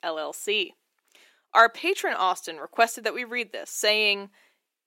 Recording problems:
thin; somewhat; fading below 350 Hz

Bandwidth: 16 kHz